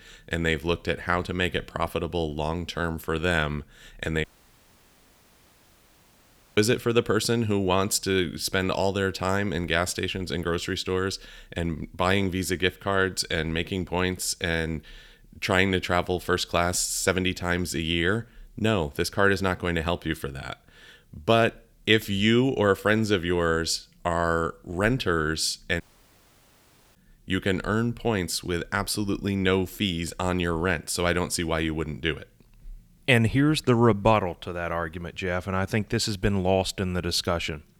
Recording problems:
audio cutting out; at 4 s for 2.5 s and at 26 s for 1 s

